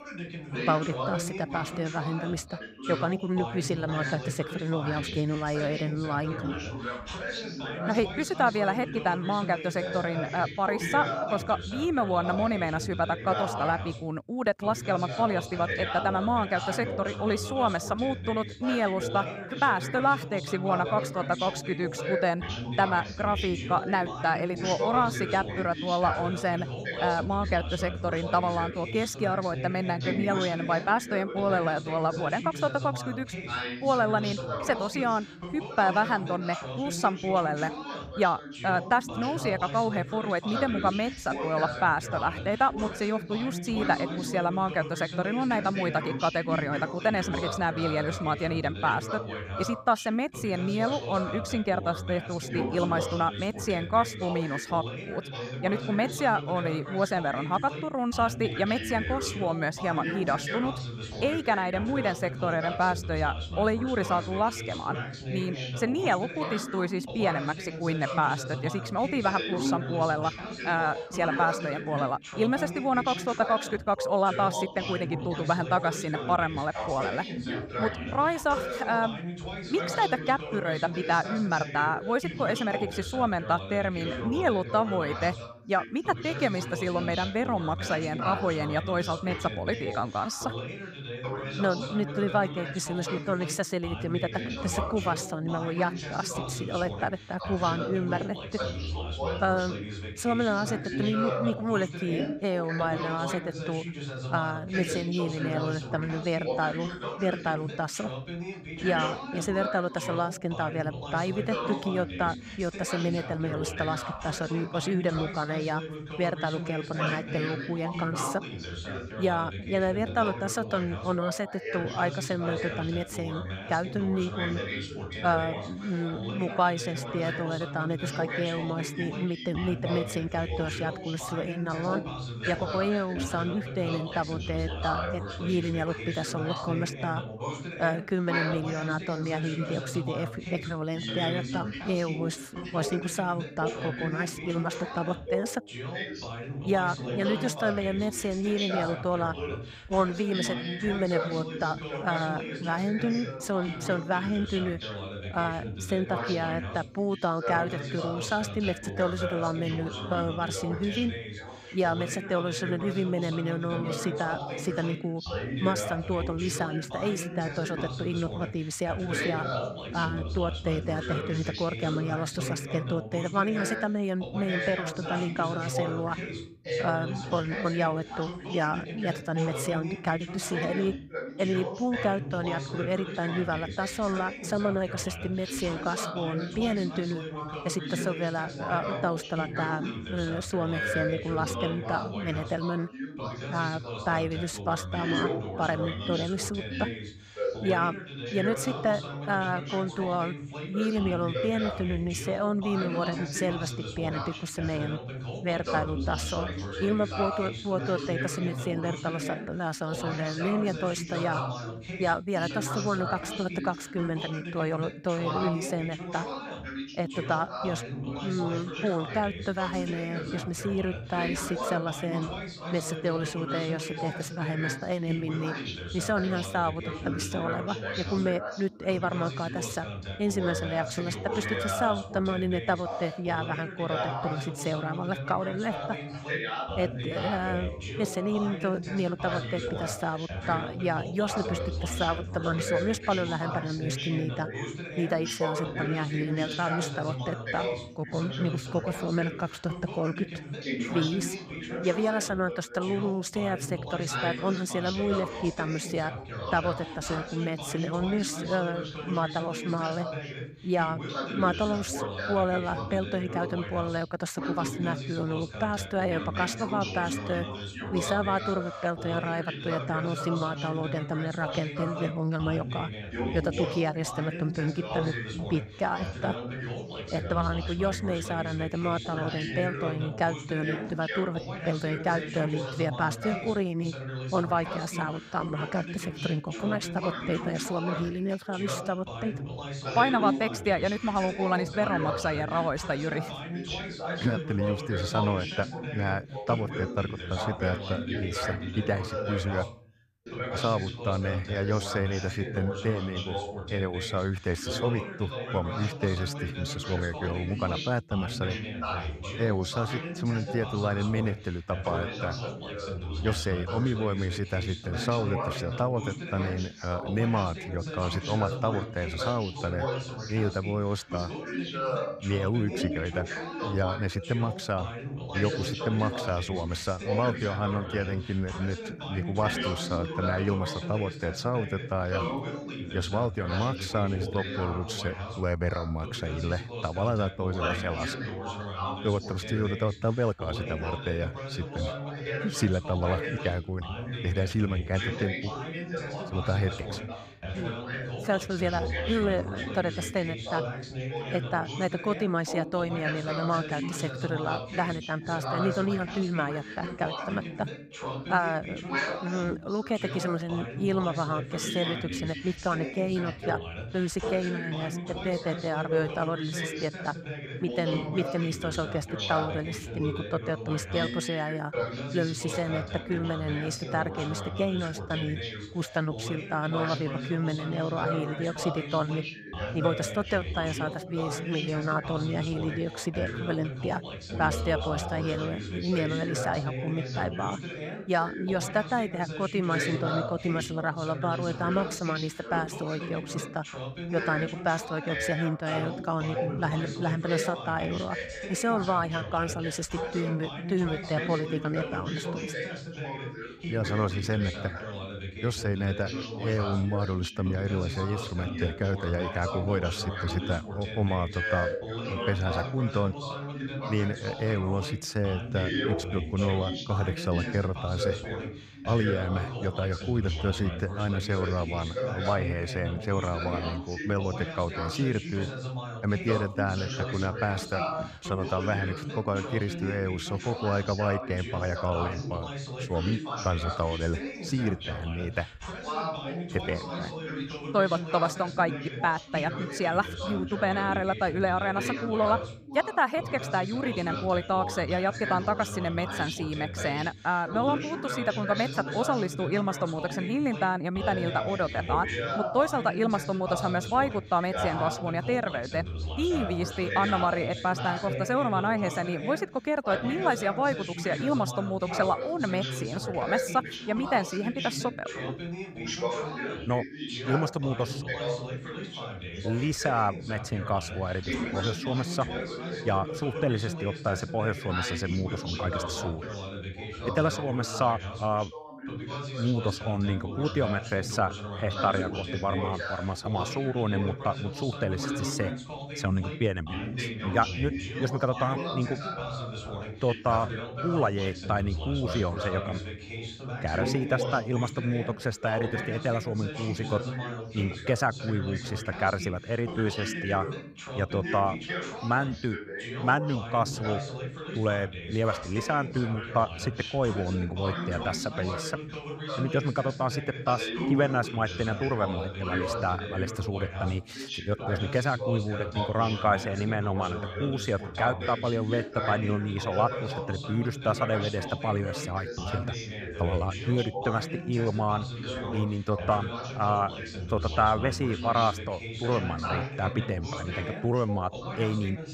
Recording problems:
background chatter; loud; throughout; 2 voices, 5 dB below the speech

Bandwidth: 15.5 kHz